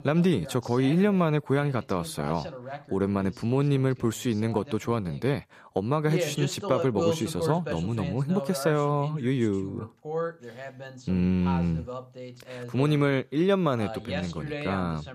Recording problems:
voice in the background; loud; throughout; 9 dB below the speech

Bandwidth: 14.5 kHz